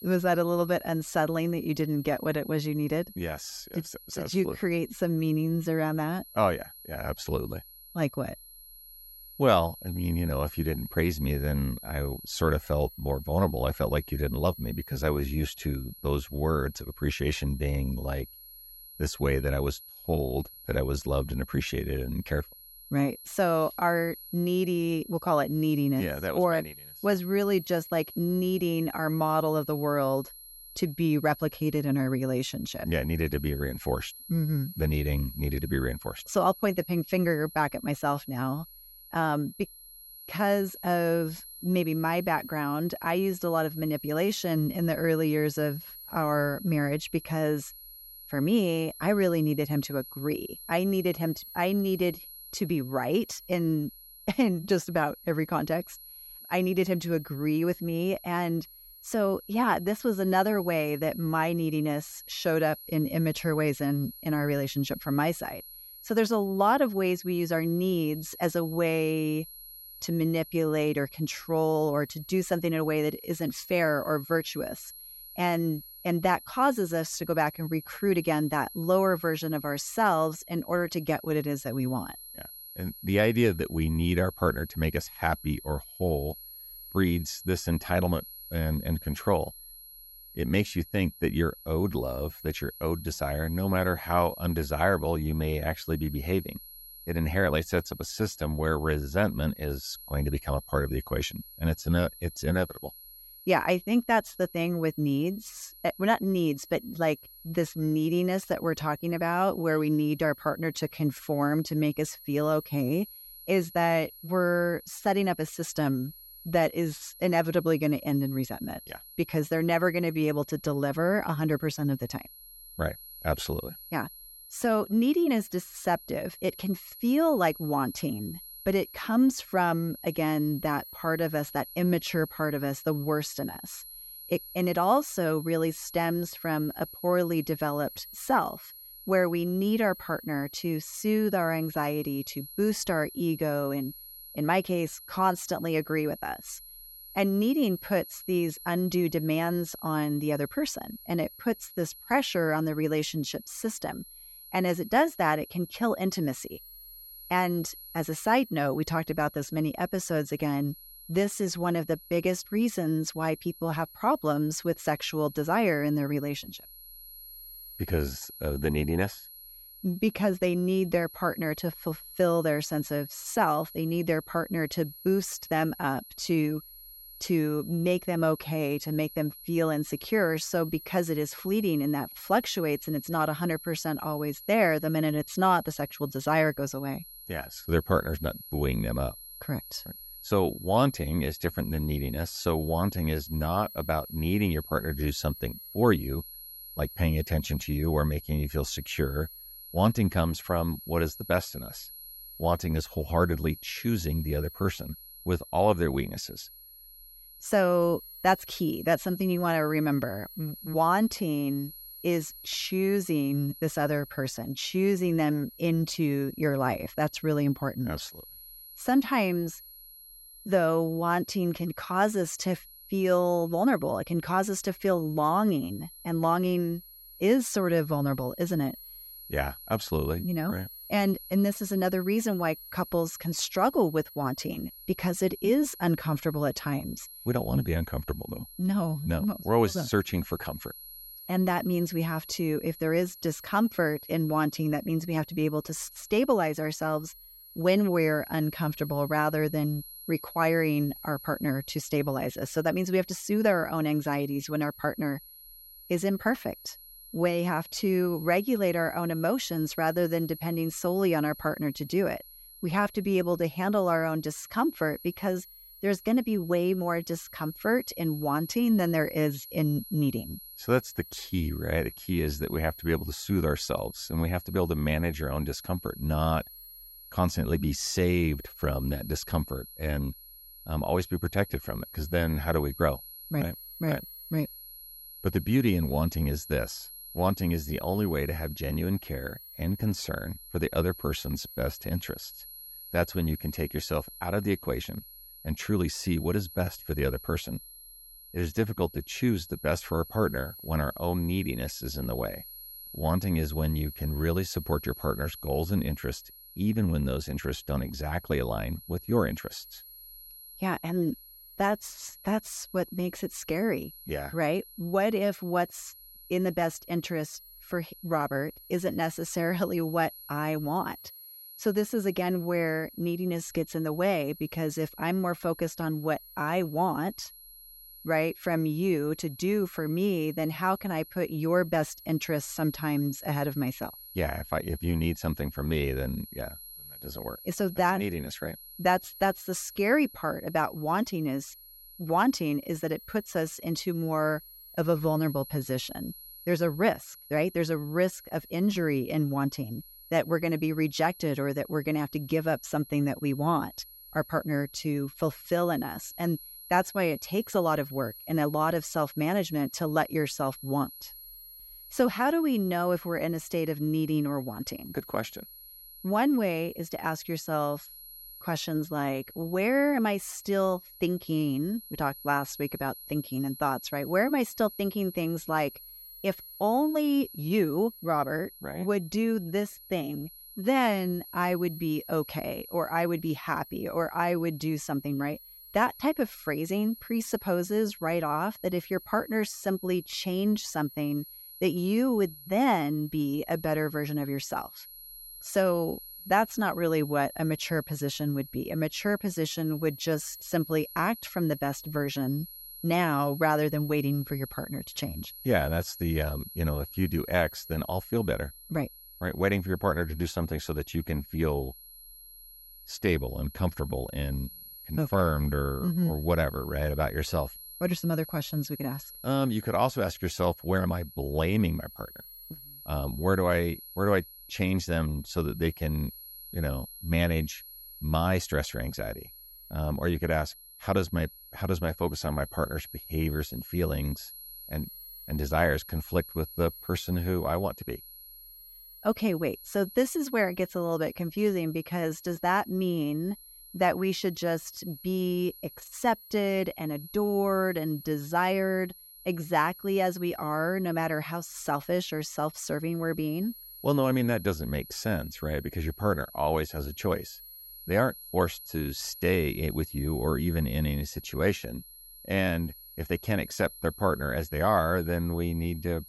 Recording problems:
high-pitched whine; noticeable; throughout; 11.5 kHz, 15 dB below the speech

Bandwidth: 16 kHz